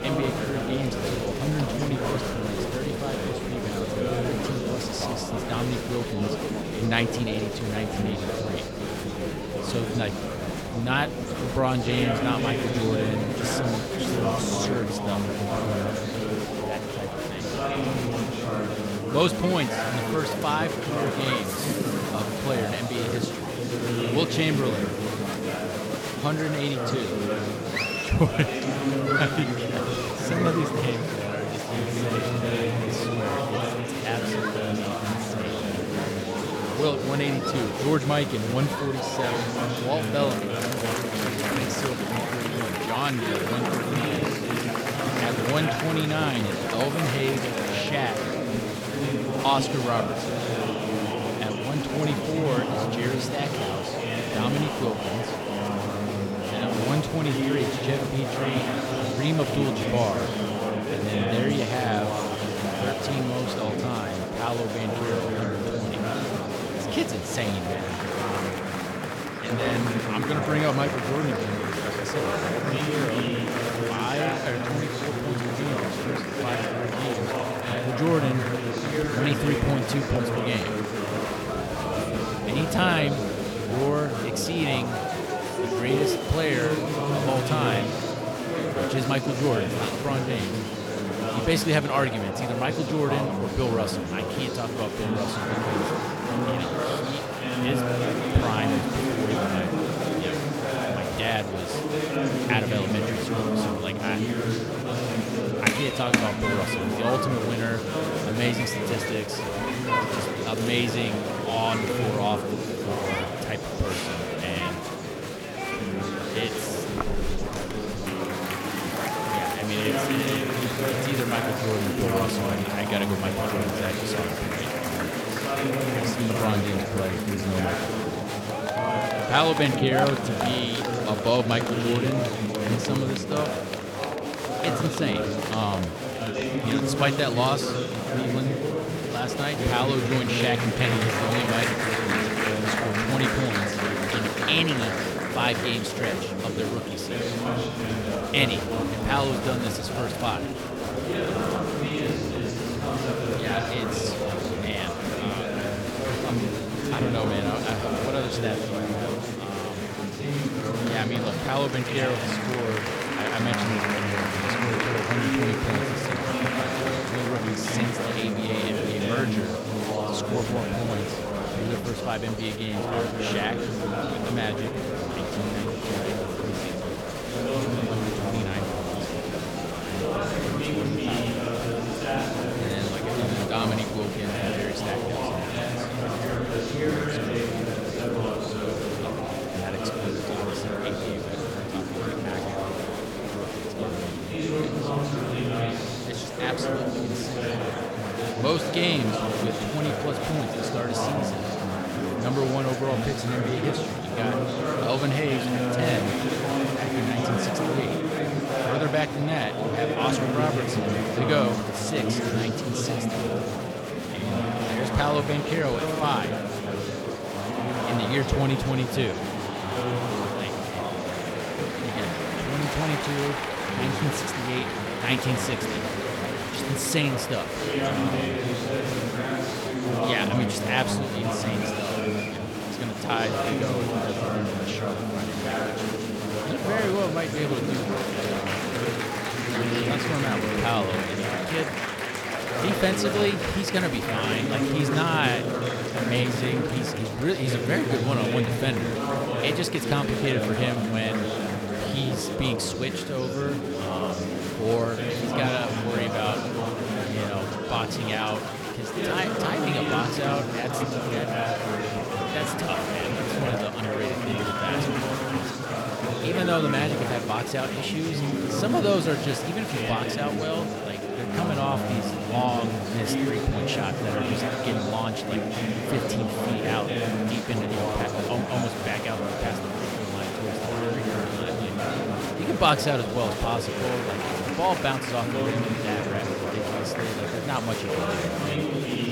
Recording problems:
murmuring crowd; very loud; throughout; 2 dB above the speech

